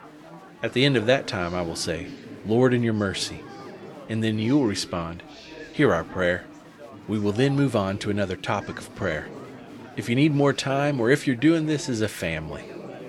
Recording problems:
chatter from many people; noticeable; throughout; 15 dB below the speech

